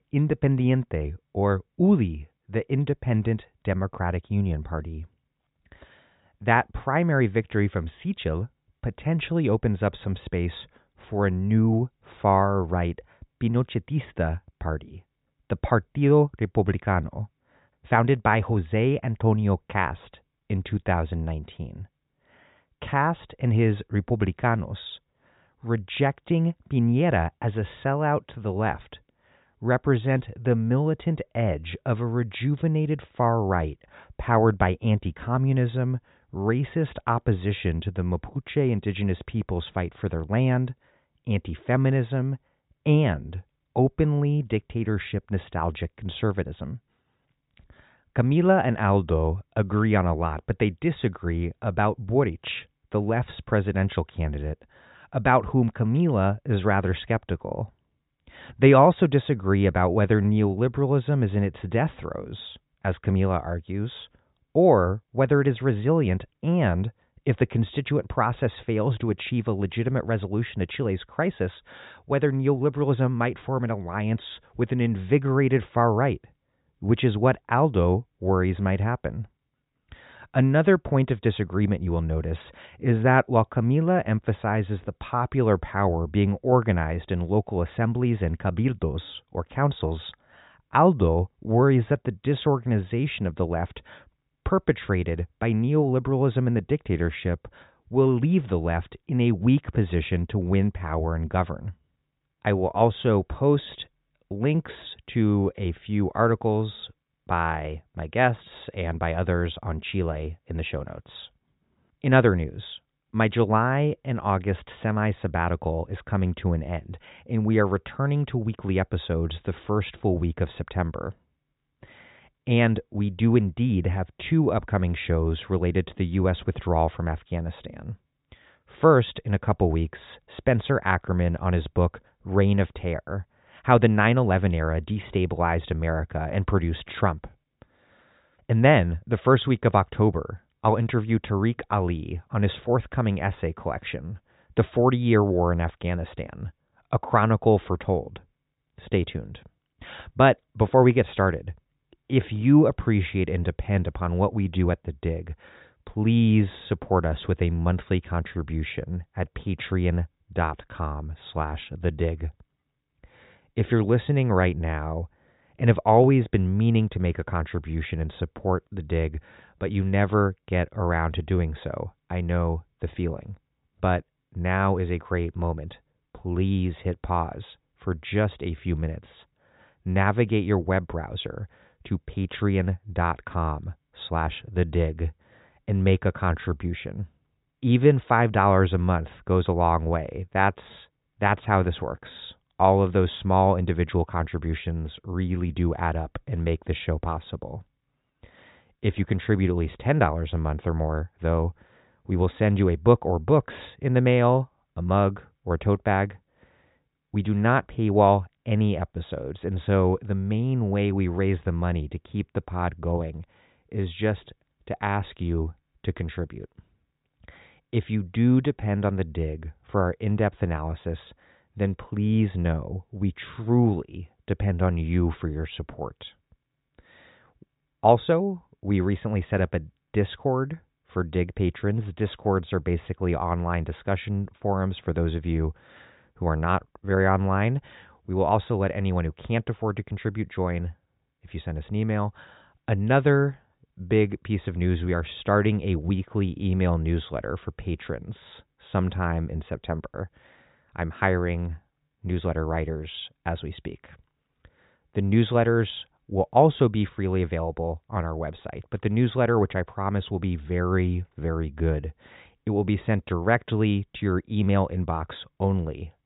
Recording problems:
high frequencies cut off; severe; nothing above 4 kHz

